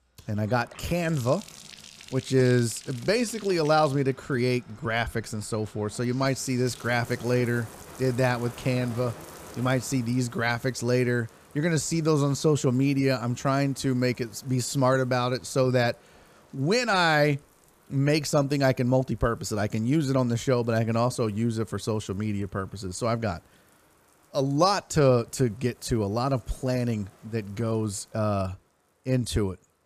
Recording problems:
household noises; faint; throughout; 20 dB below the speech

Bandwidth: 15 kHz